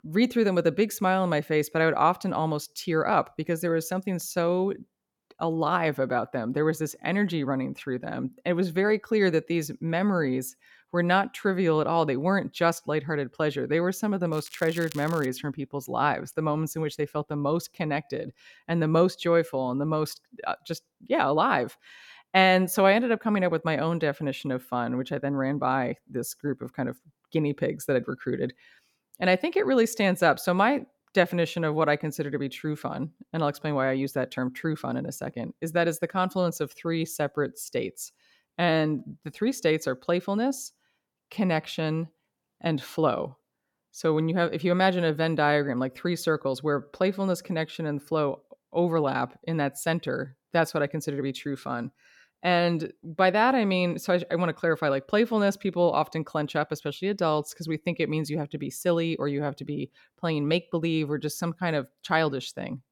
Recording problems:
crackling; noticeable; at 14 s; 20 dB below the speech

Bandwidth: 18 kHz